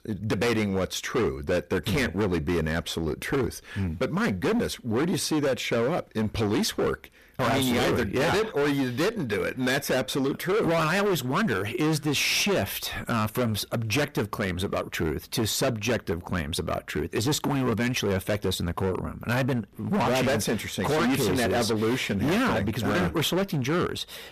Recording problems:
distortion; heavy; 22% of the sound clipped

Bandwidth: 14.5 kHz